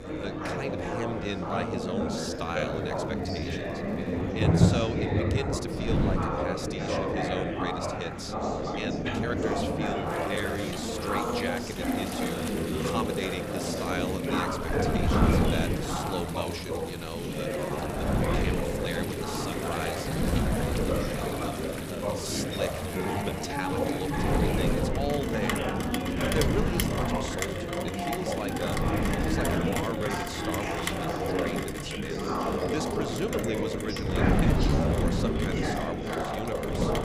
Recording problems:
chatter from many people; very loud; throughout; 5 dB above the speech
wind noise on the microphone; heavy; 1 dB below the speech
rain or running water; loud; throughout; as loud as the speech
crackling; faint; from 2 to 4.5 s, from 9 to 12 s and from 27 to 28 s; 25 dB below the speech
uneven, jittery; strongly; from 2 to 35 s

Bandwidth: 15 kHz